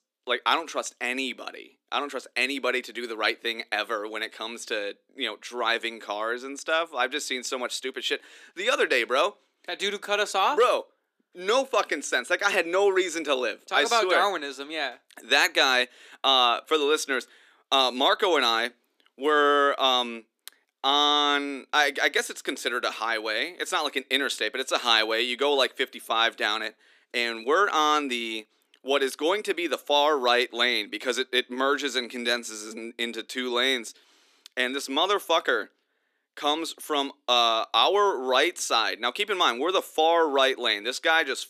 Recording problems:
thin; somewhat; fading below 300 Hz

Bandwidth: 14.5 kHz